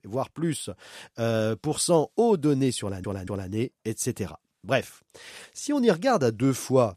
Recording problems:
audio stuttering; at 3 s

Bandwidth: 14.5 kHz